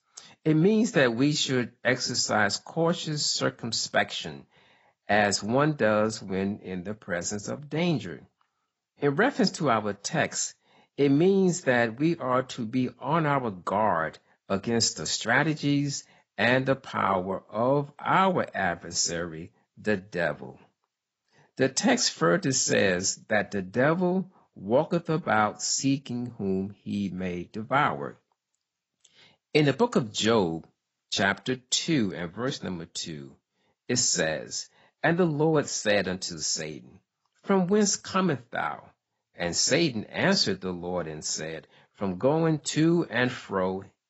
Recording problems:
garbled, watery; badly; nothing above 7.5 kHz

